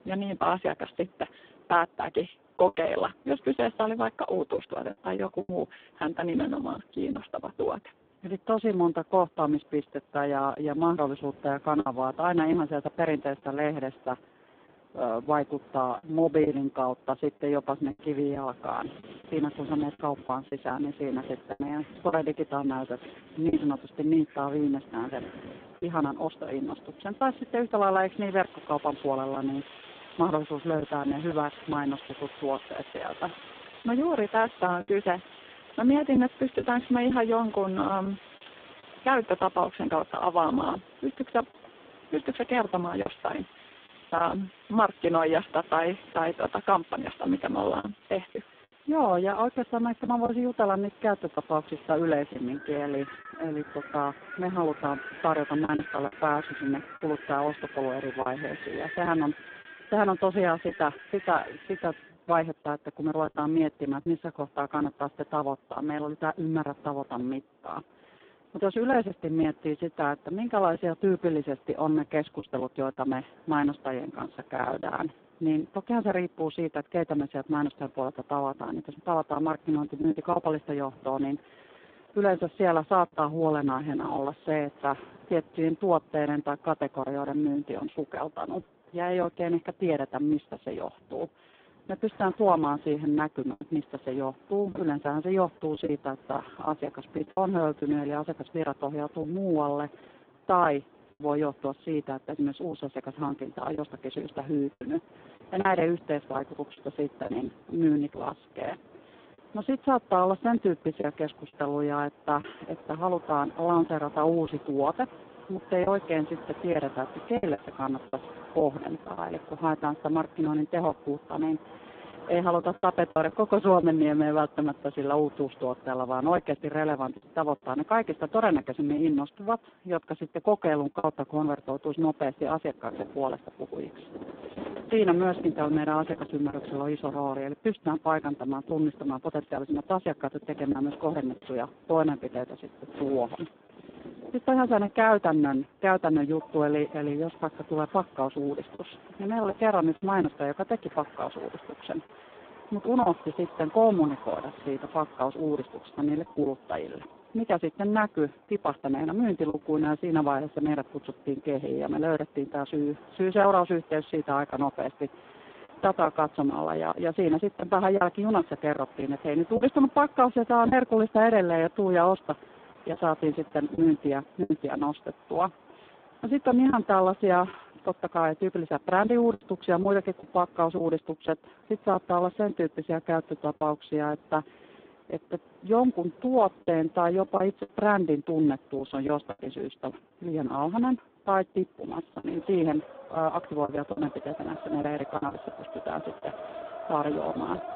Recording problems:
phone-call audio; poor line; nothing above 3.5 kHz
wind in the background; noticeable; throughout; 20 dB below the speech
choppy; occasionally; 3% of the speech affected

